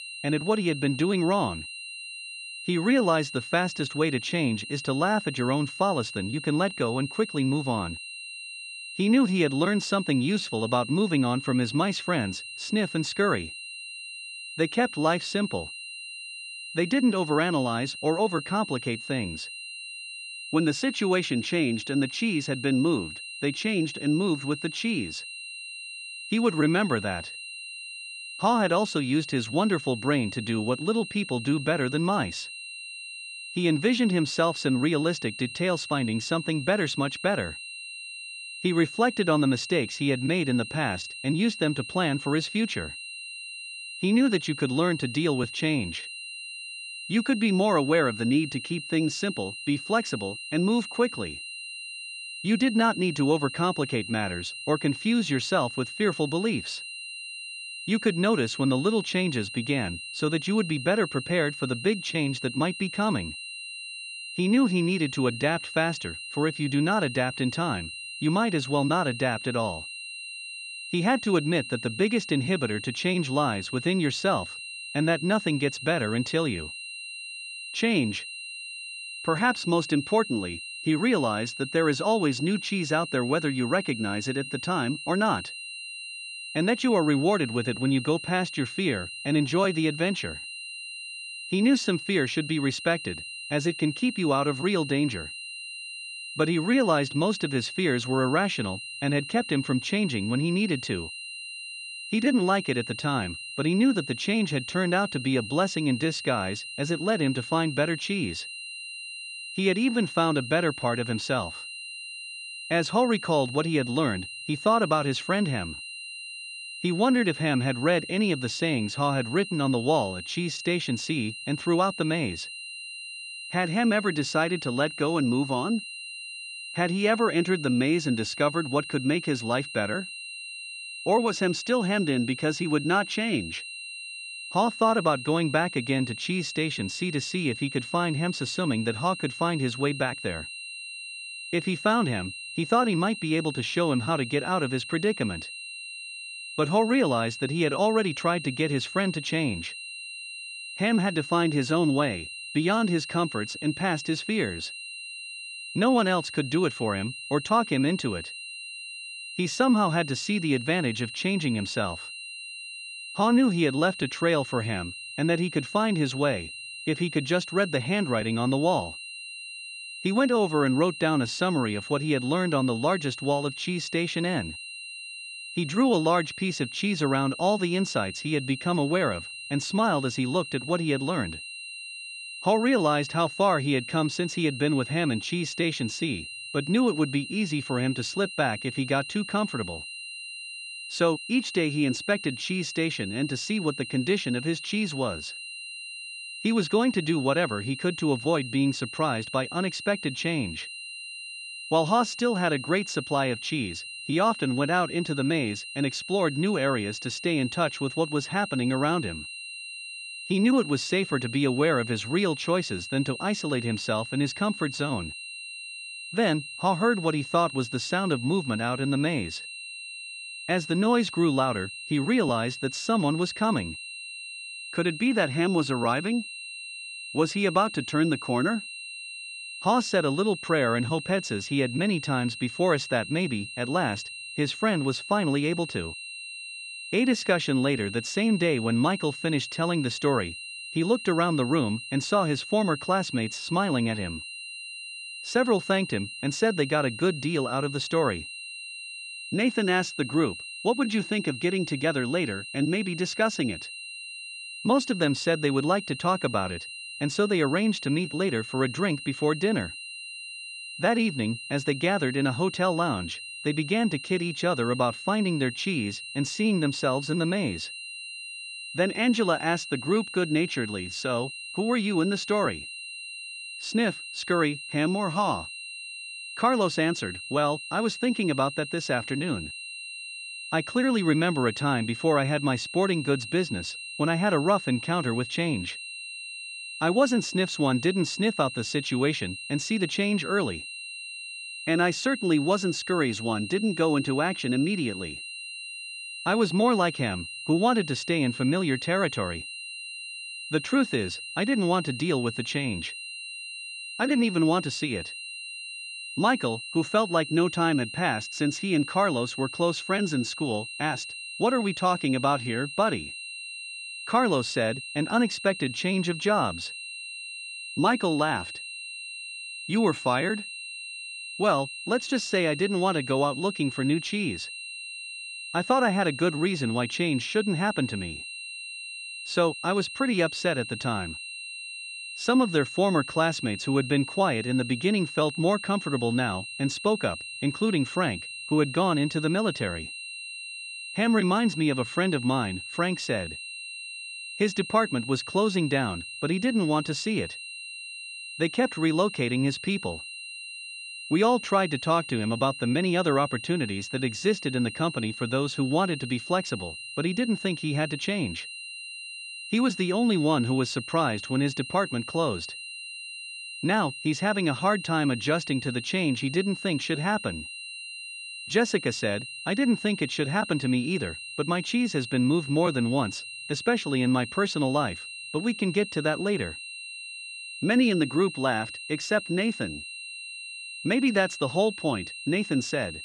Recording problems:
high-pitched whine; loud; throughout; 3 kHz, 10 dB below the speech

